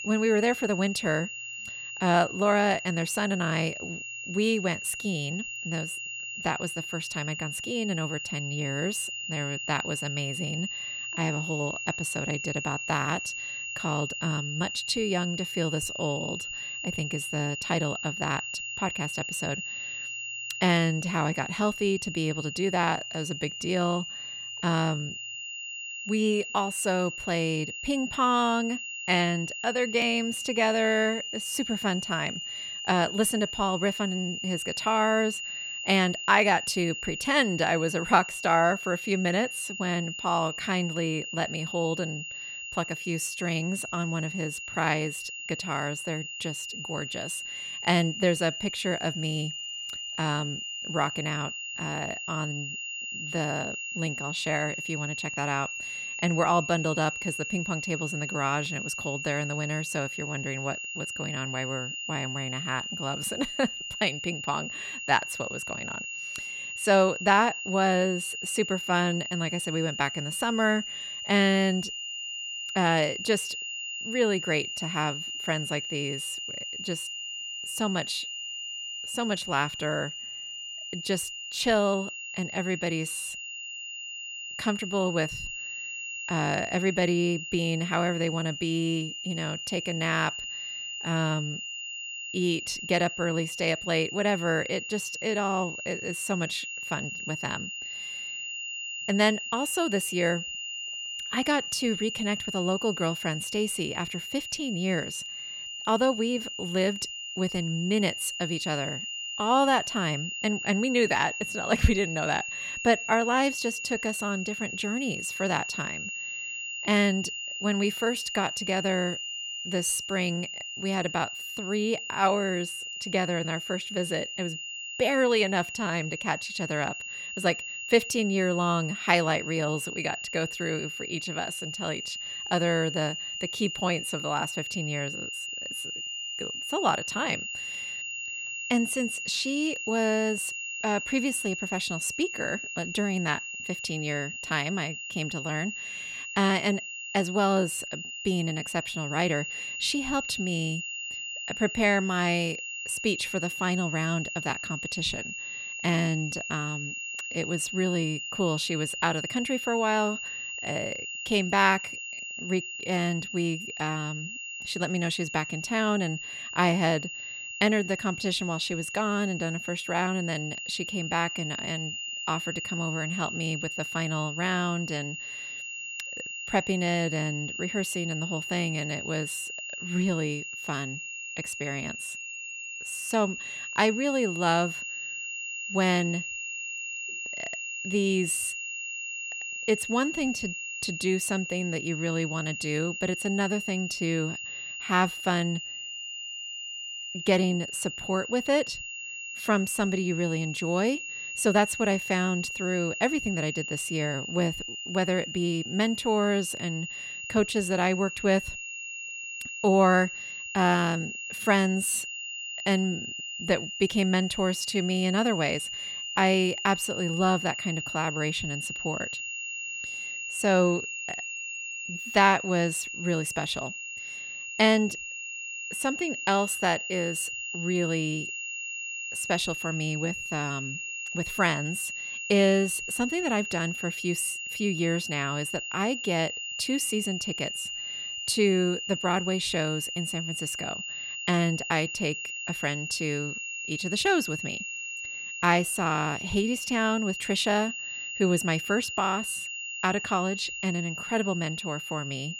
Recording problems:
high-pitched whine; loud; throughout; 3 kHz, 5 dB below the speech

